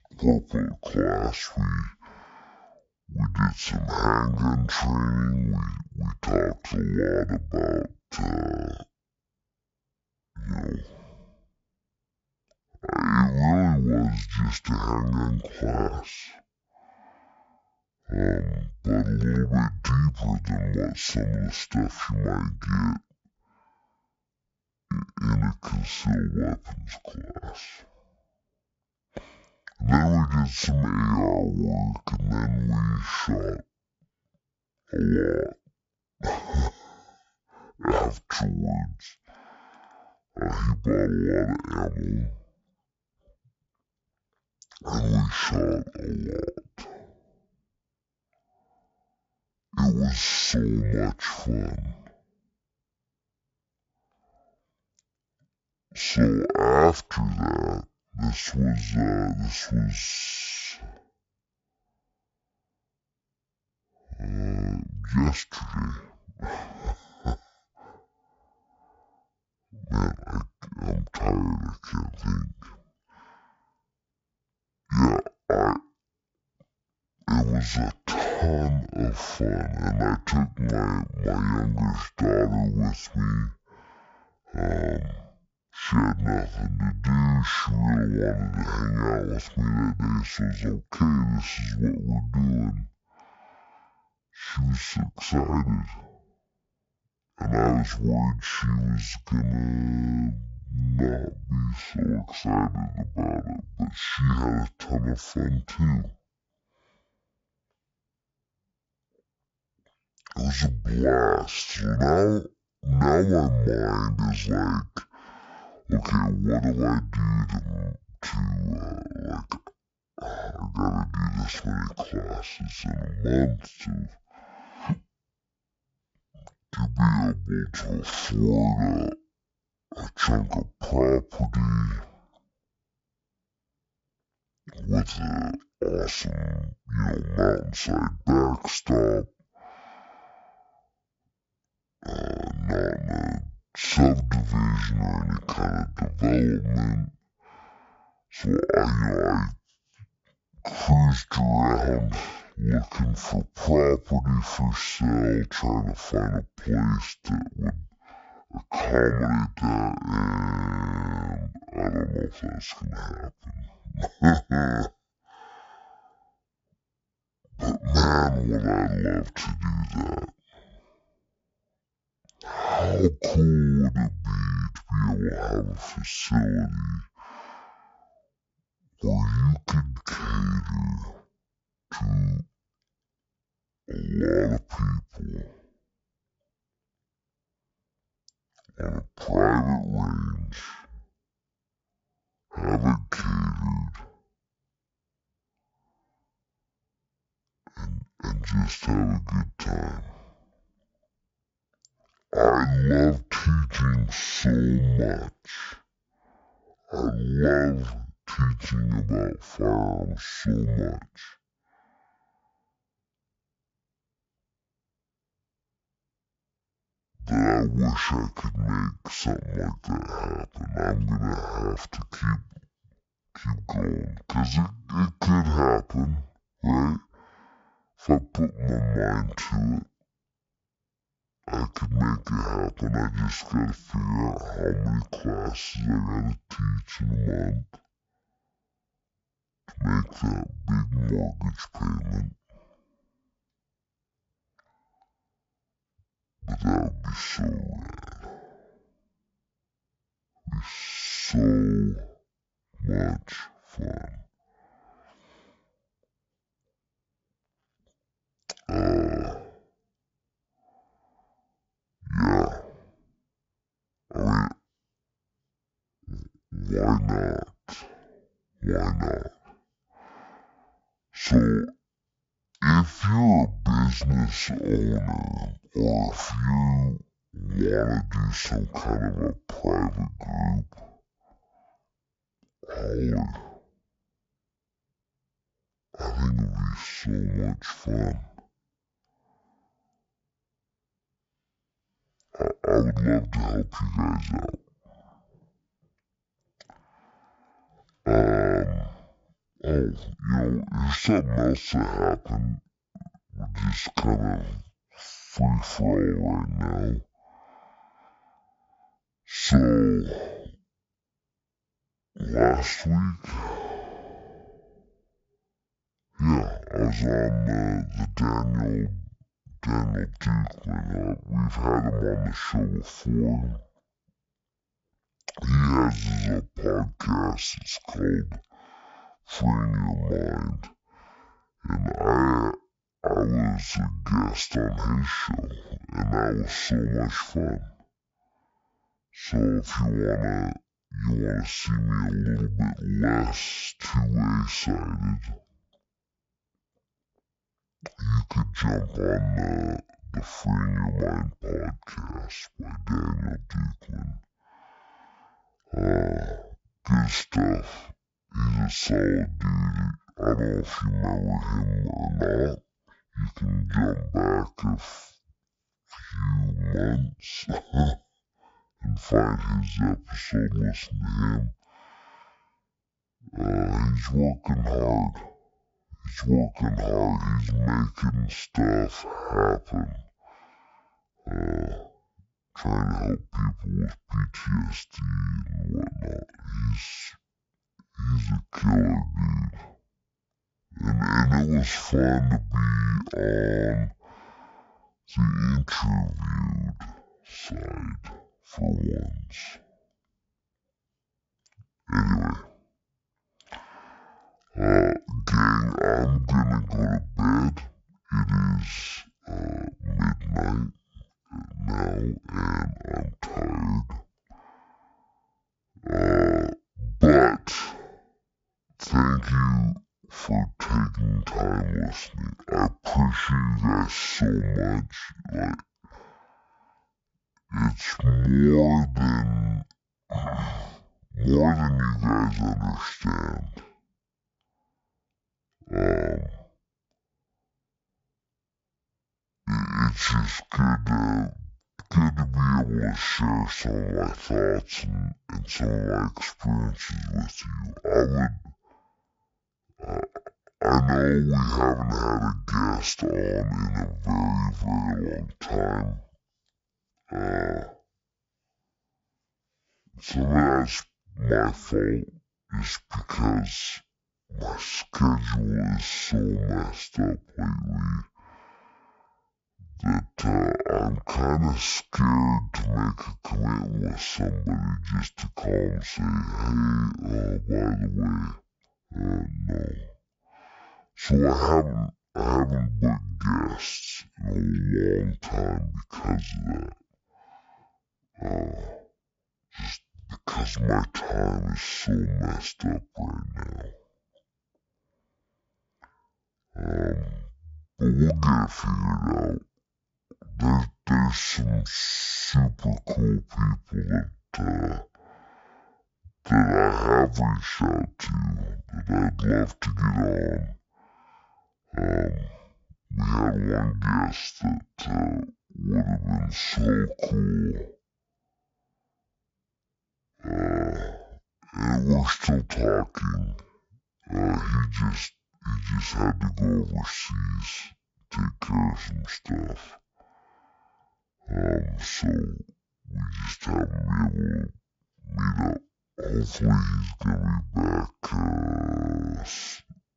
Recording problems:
wrong speed and pitch; too slow and too low; 0.5 times normal speed

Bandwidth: 7.5 kHz